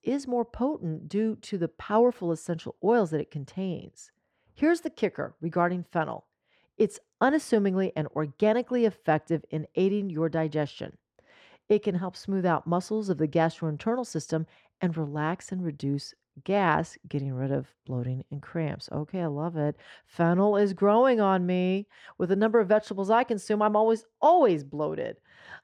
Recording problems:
muffled; slightly; fading above 1.5 kHz

